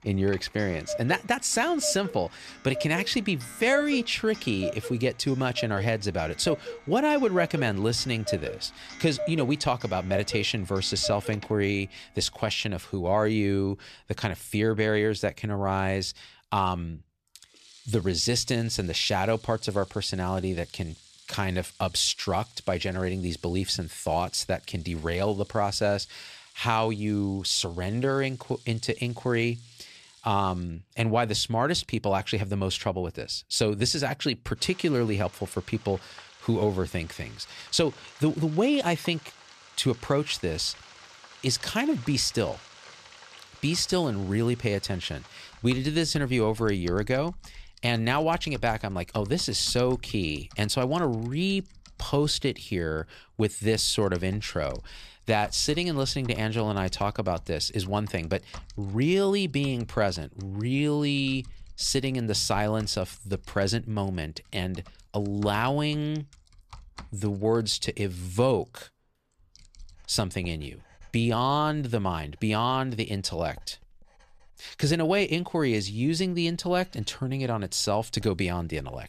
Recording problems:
household noises; noticeable; throughout; 15 dB below the speech

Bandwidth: 14.5 kHz